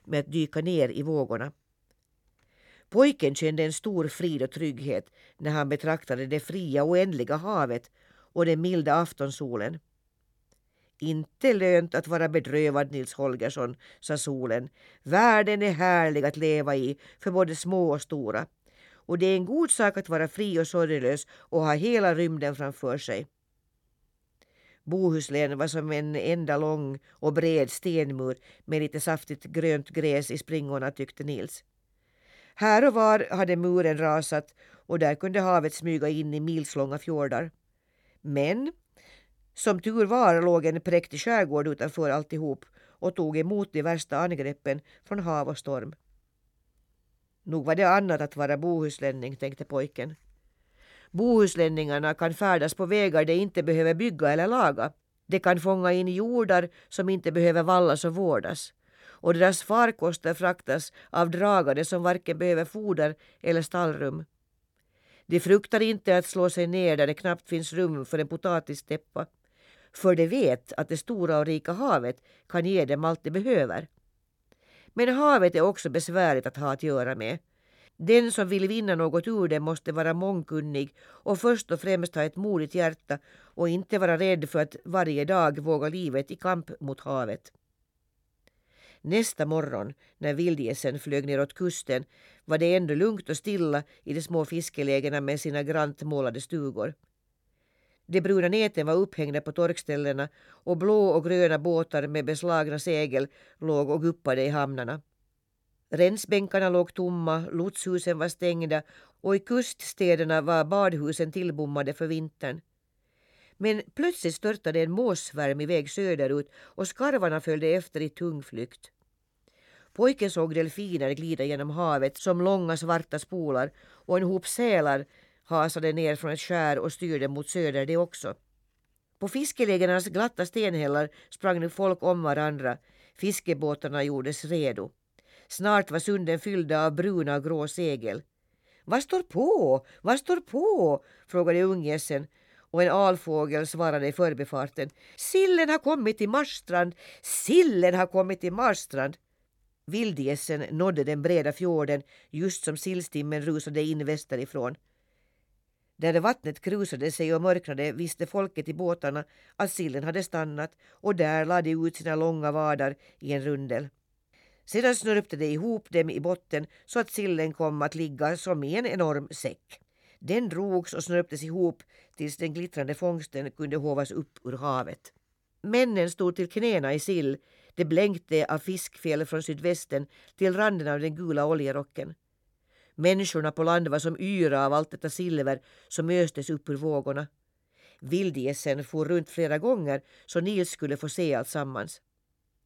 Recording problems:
none

